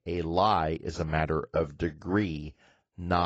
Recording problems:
garbled, watery; badly; nothing above 7.5 kHz
abrupt cut into speech; at the end

